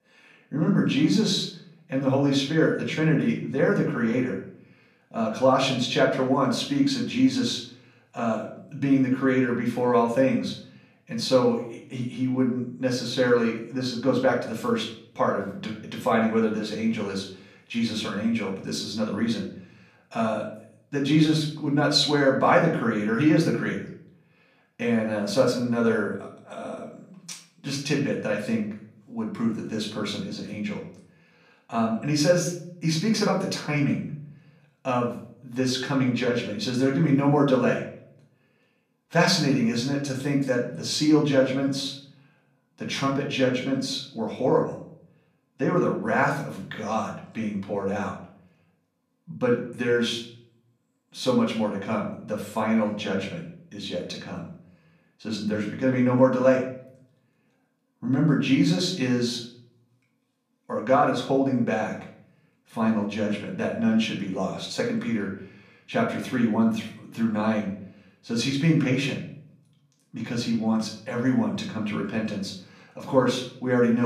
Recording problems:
off-mic speech; far
room echo; slight; dies away in 0.5 s
abrupt cut into speech; at the end

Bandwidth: 14.5 kHz